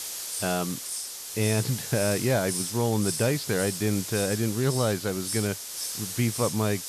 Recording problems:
high frequencies cut off; slight; nothing above 5.5 kHz
hiss; loud; throughout; 4 dB below the speech

